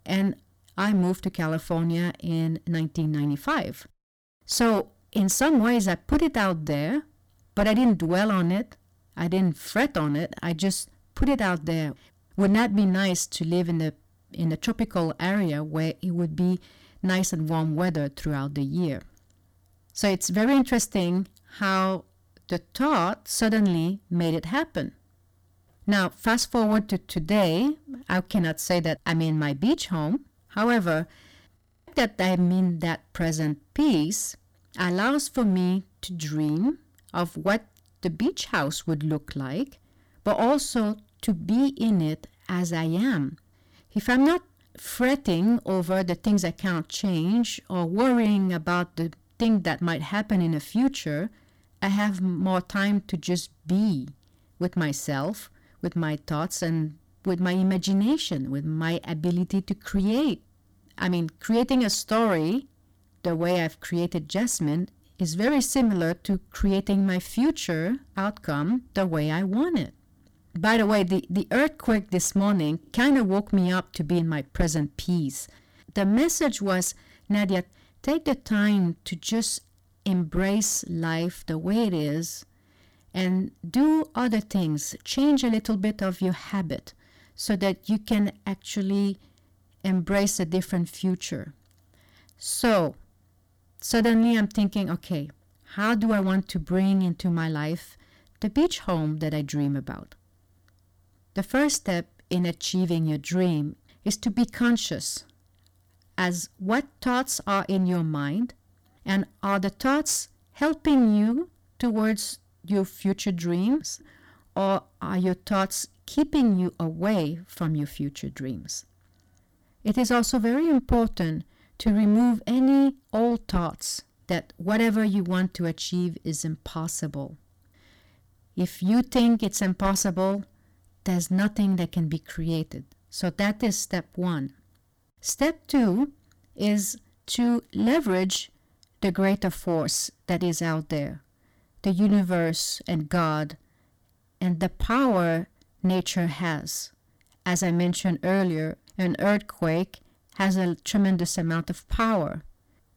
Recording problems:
distortion; slight; 8% of the sound clipped
audio freezing; at 32 s

